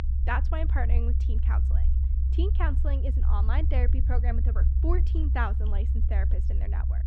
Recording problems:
muffled; slightly; fading above 3.5 kHz
low rumble; loud; throughout; 8 dB below the speech

